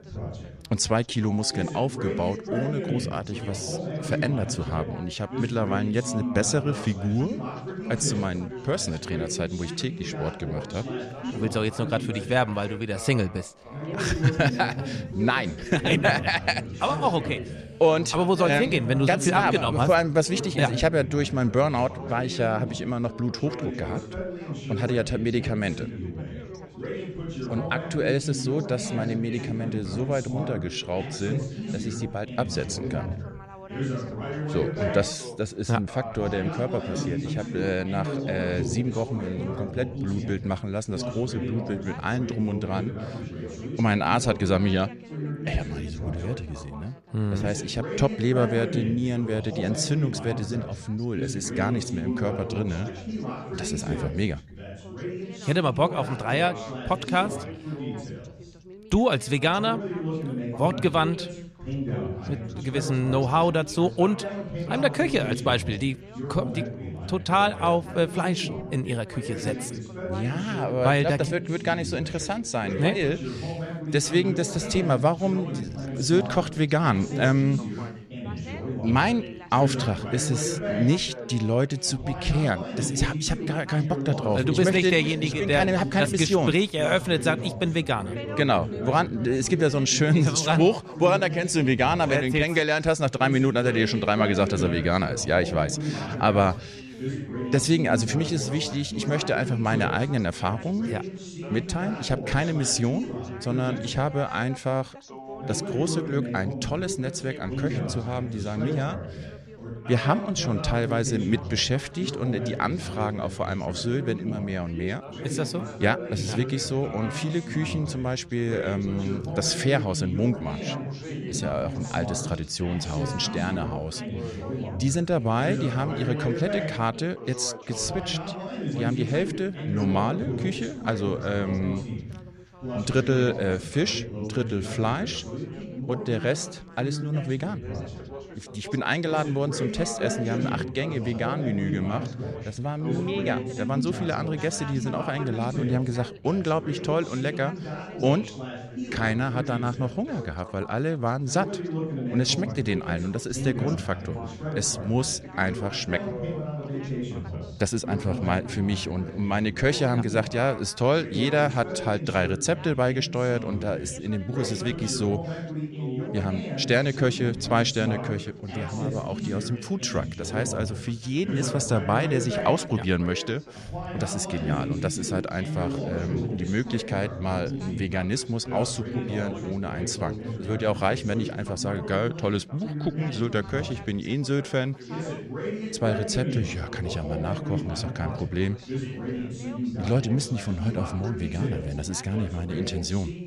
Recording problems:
background chatter; loud; throughout; 3 voices, 7 dB below the speech

